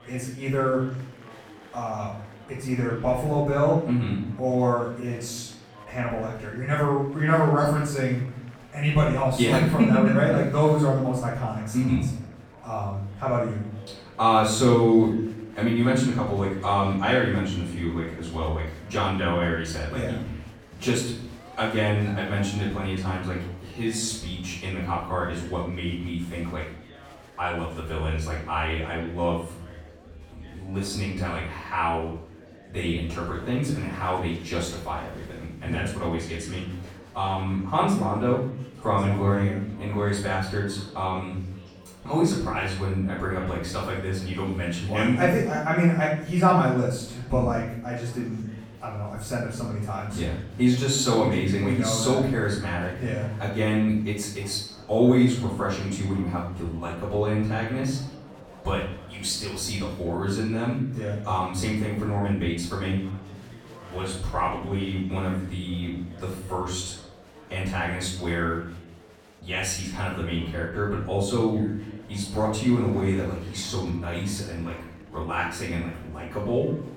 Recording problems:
off-mic speech; far
room echo; noticeable; dies away in 0.7 s
murmuring crowd; faint; throughout; 20 dB below the speech

